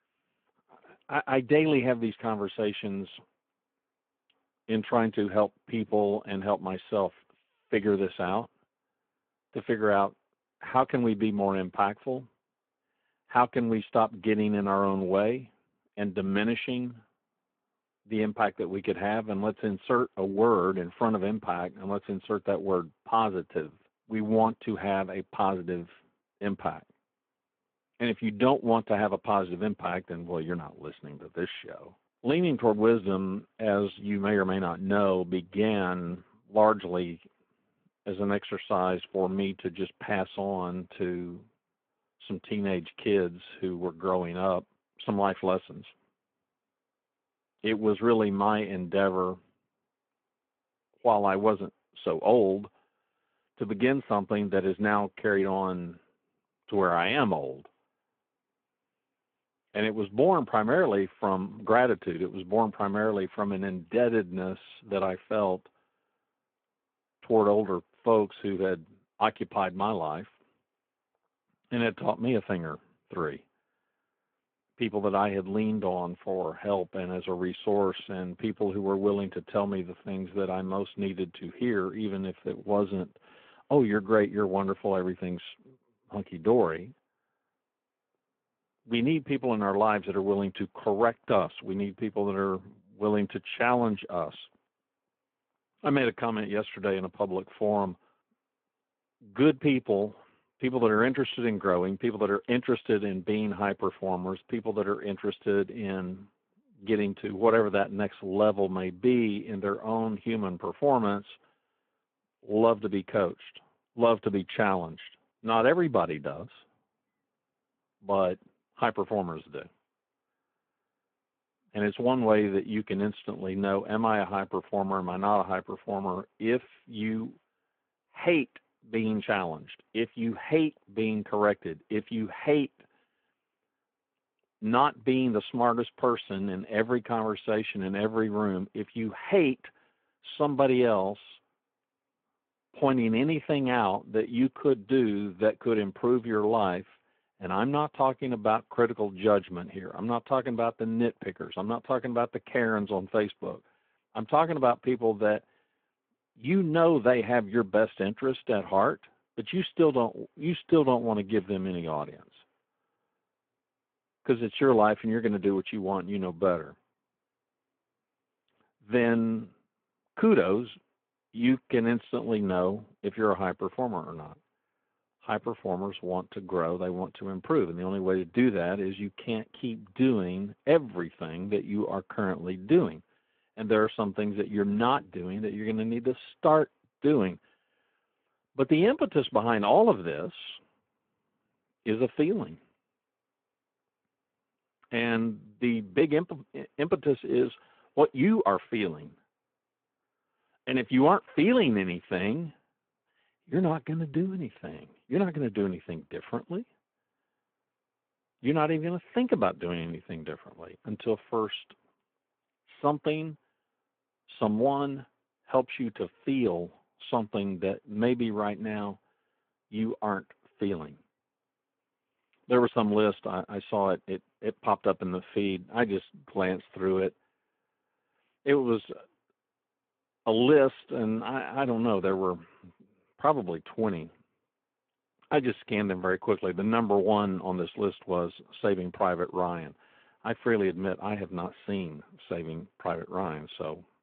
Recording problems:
phone-call audio

